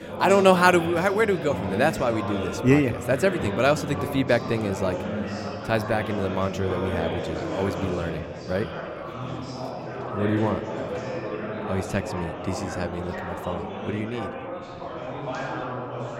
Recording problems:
chatter from many people; loud; throughout; 7 dB below the speech

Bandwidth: 16 kHz